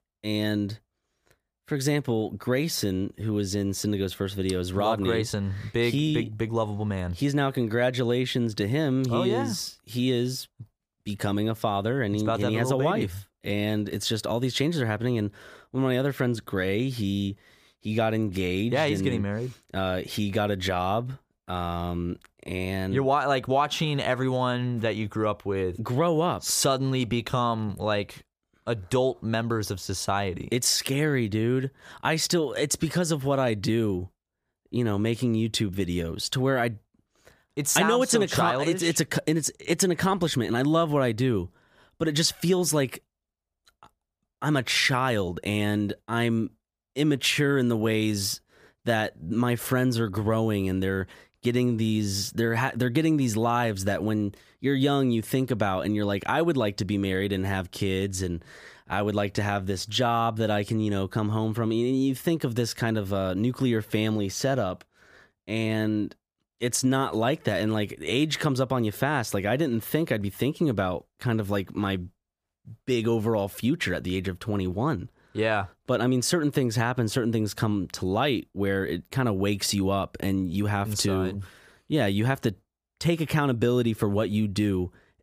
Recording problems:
none

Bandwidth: 15 kHz